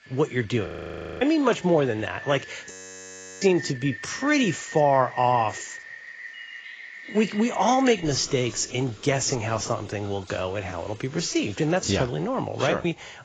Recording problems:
garbled, watery; badly; nothing above 7.5 kHz
rain or running water; noticeable; throughout; 15 dB below the speech
audio freezing; at 0.5 s for 0.5 s and at 2.5 s for 0.5 s

